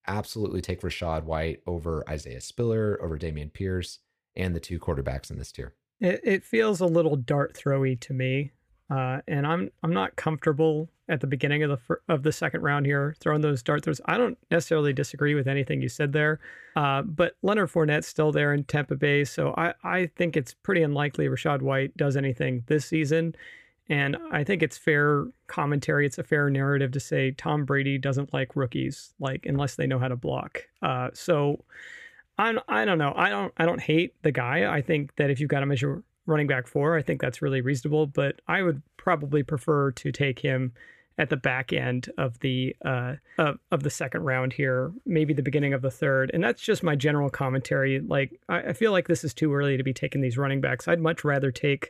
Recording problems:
none

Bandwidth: 15 kHz